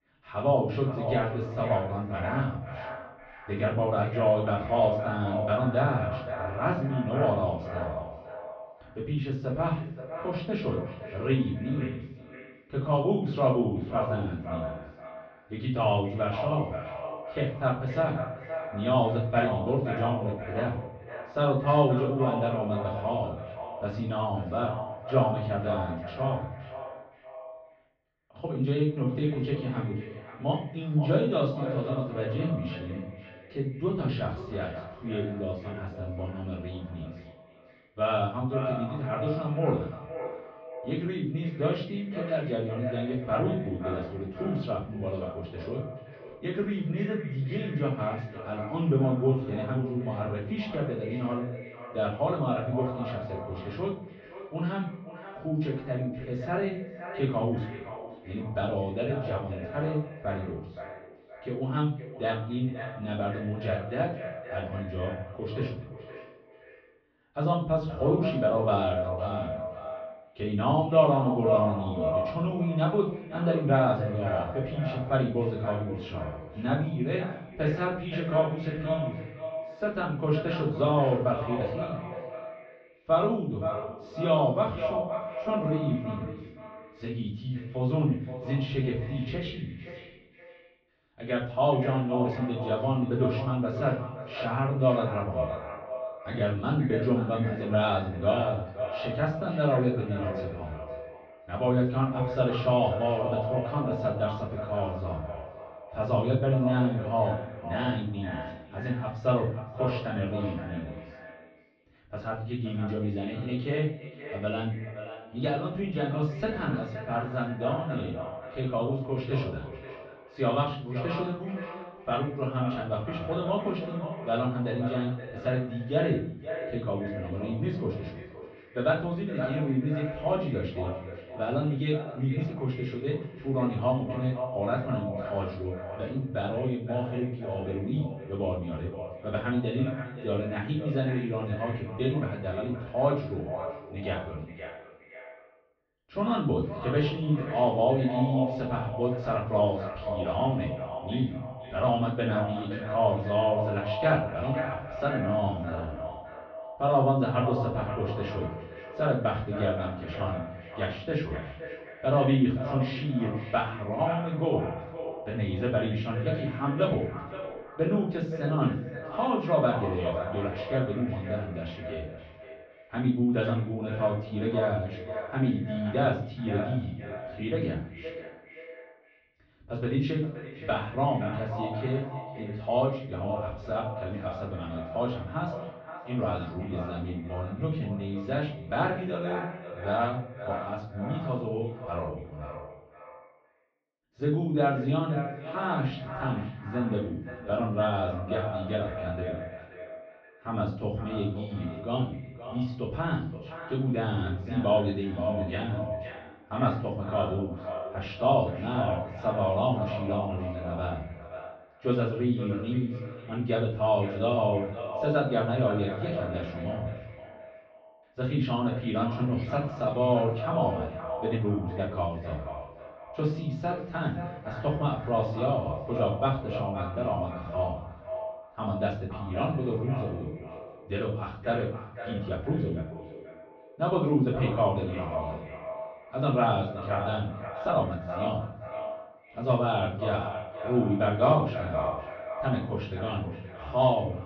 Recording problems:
echo of what is said; strong; throughout; 520 ms later, 9 dB below the speech
off-mic speech; far
muffled; very; fading above 3.5 kHz
room echo; slight; dies away in 0.6 s
high frequencies cut off; slight; nothing above 8 kHz
uneven, jittery; strongly; from 28 s to 3:58

